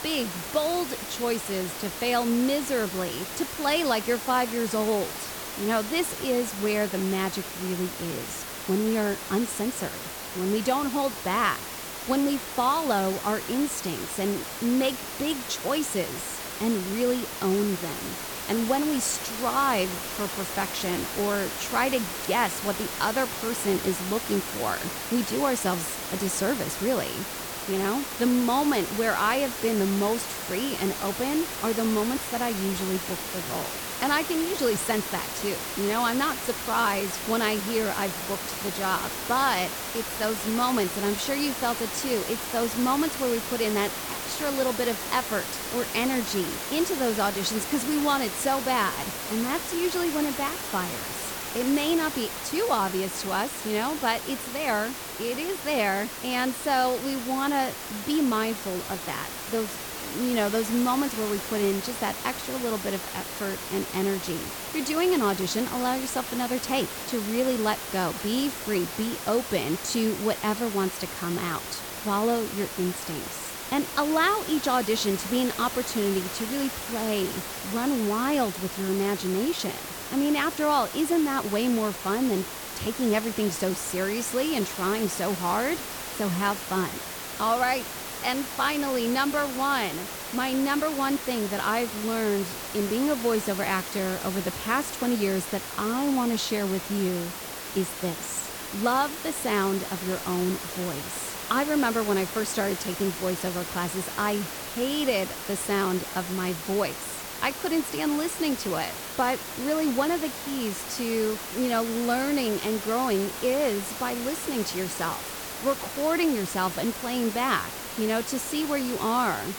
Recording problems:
hiss; loud; throughout; 5 dB below the speech

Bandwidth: 18.5 kHz